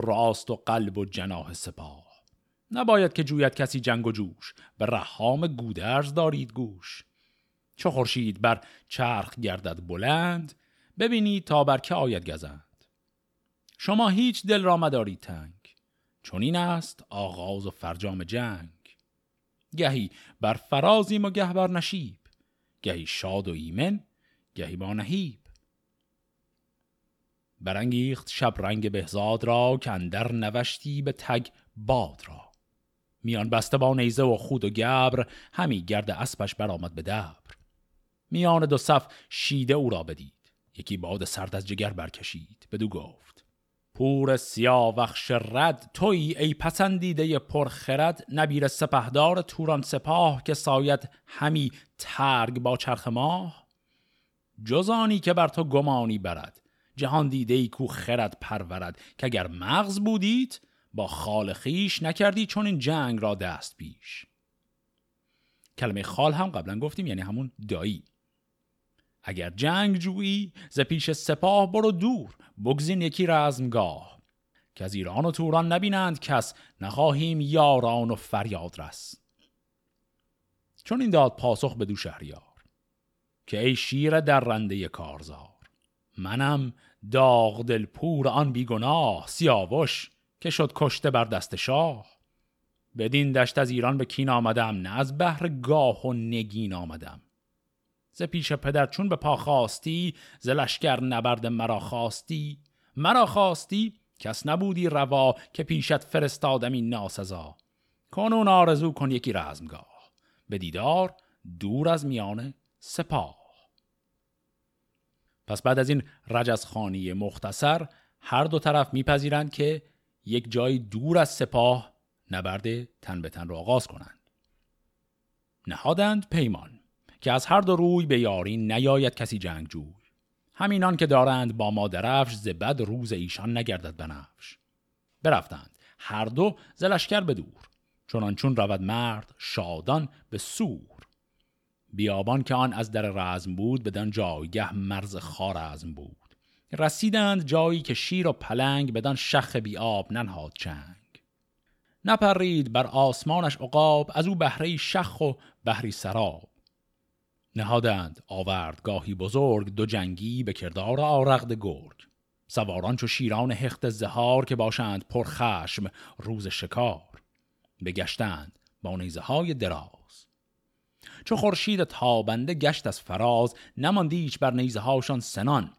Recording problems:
abrupt cut into speech; at the start

